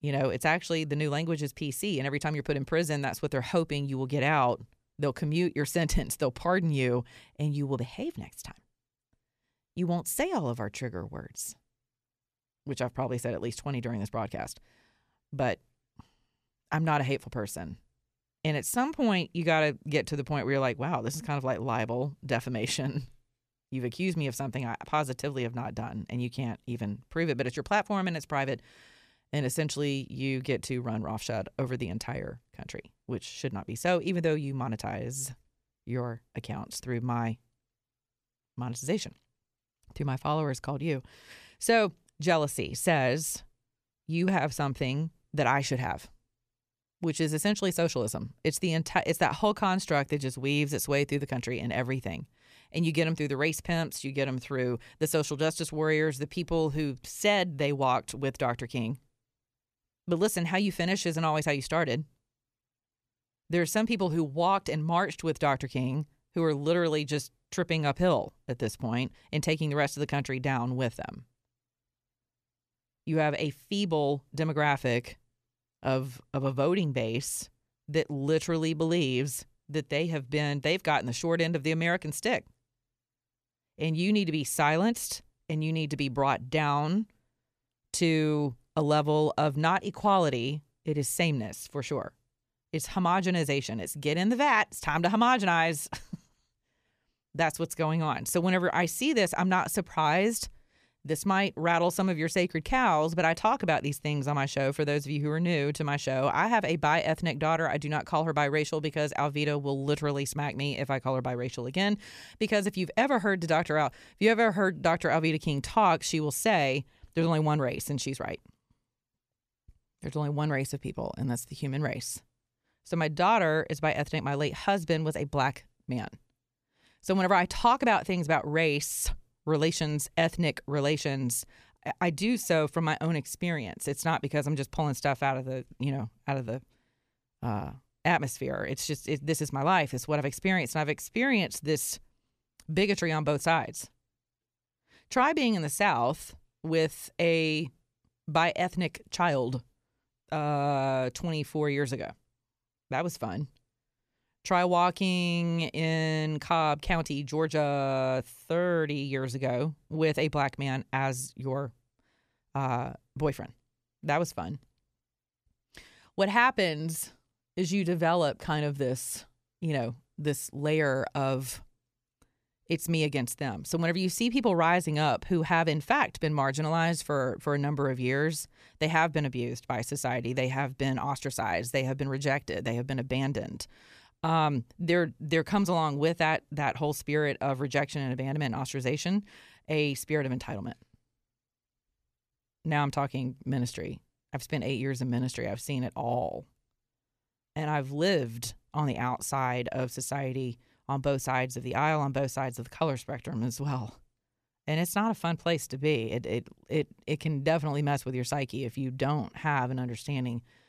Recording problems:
none

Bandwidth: 14.5 kHz